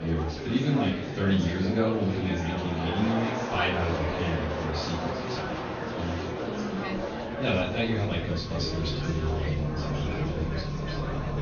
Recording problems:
off-mic speech; far
high frequencies cut off; noticeable; nothing above 6.5 kHz
room echo; slight; dies away in 0.5 s
traffic noise; loud; throughout; 8 dB below the speech
murmuring crowd; loud; throughout; 4 dB below the speech
abrupt cut into speech; at the start

